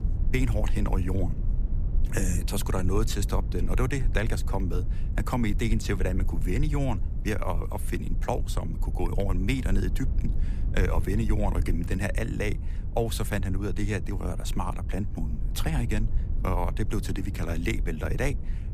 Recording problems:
low rumble; noticeable; throughout; 15 dB below the speech

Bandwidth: 15 kHz